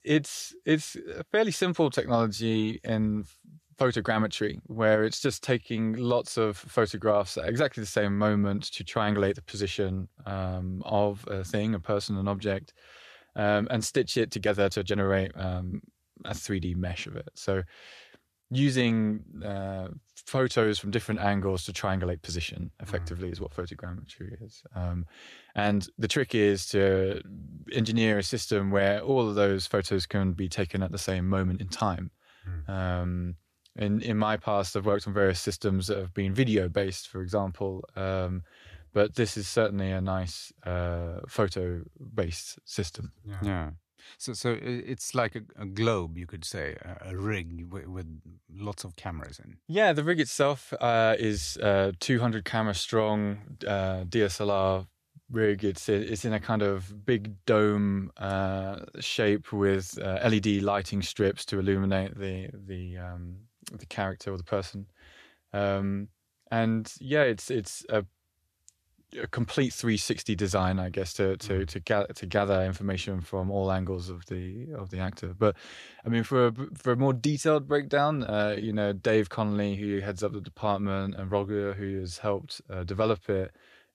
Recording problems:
uneven, jittery; strongly; from 14 s to 1:19

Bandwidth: 14.5 kHz